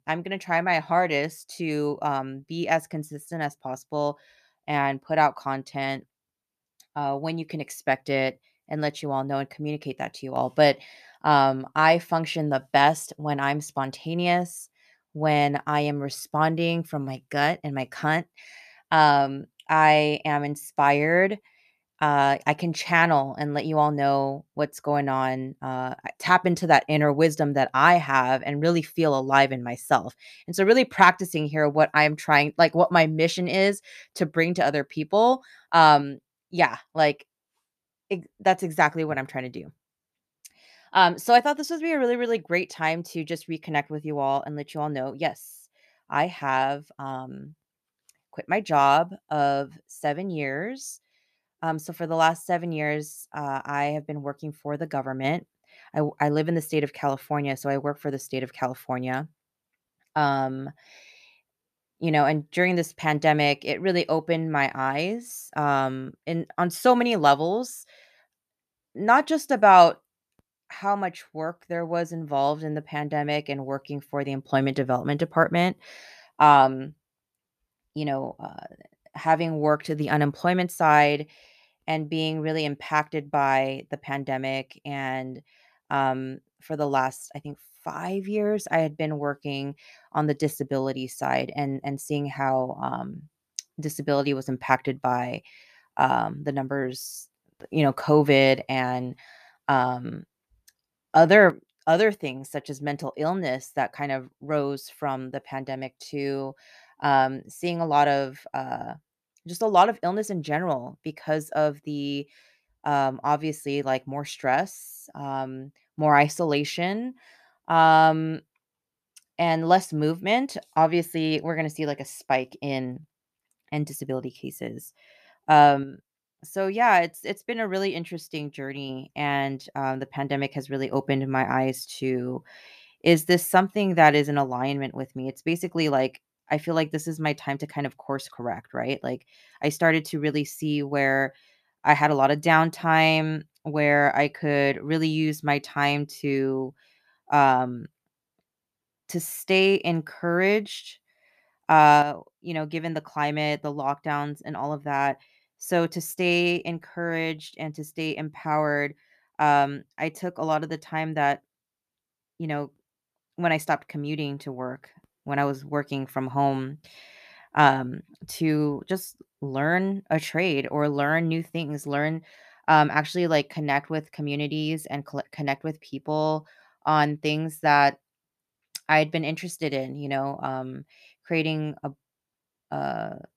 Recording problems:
none

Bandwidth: 14.5 kHz